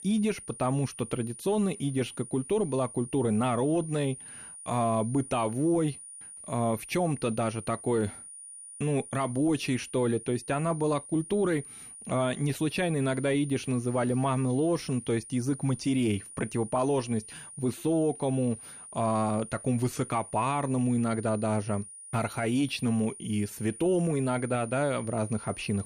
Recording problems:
high-pitched whine; noticeable; throughout; 9.5 kHz, 15 dB below the speech

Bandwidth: 14.5 kHz